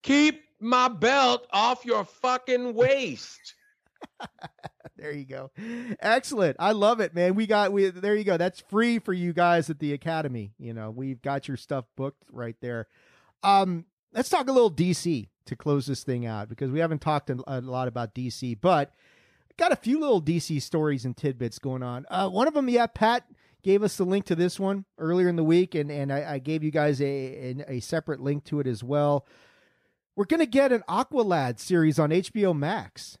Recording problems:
none

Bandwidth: 14.5 kHz